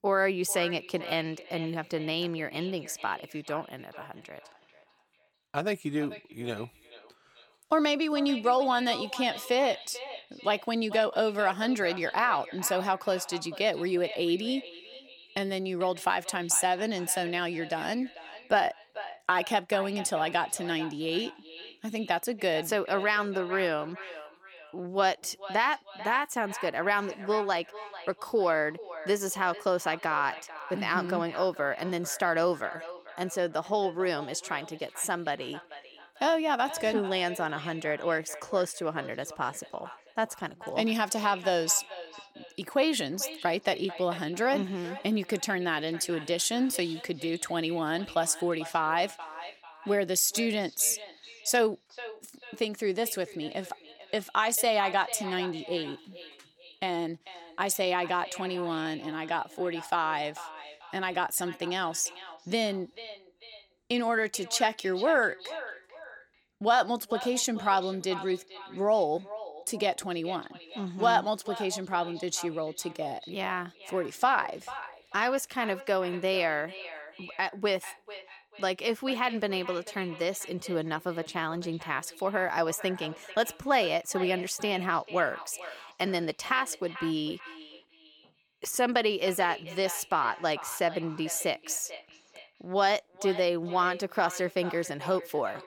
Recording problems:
echo of what is said; noticeable; throughout; 440 ms later, 15 dB below the speech

